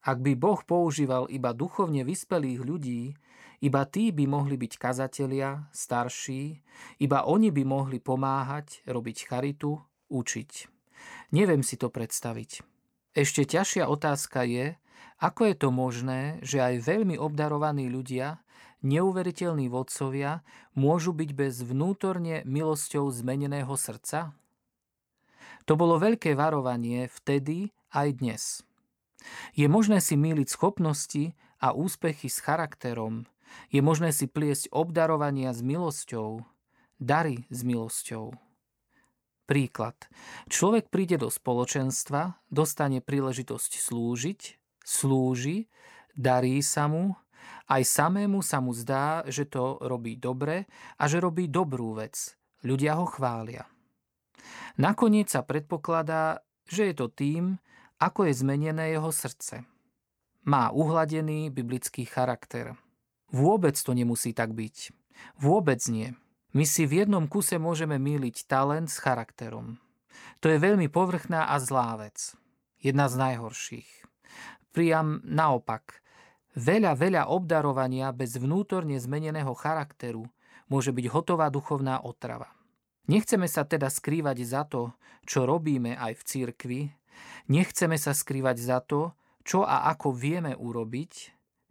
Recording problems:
none

